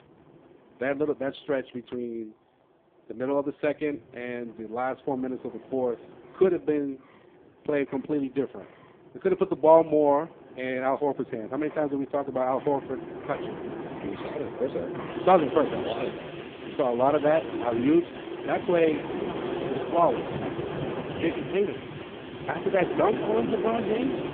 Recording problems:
phone-call audio; poor line
wind in the background; loud; throughout; 7 dB below the speech

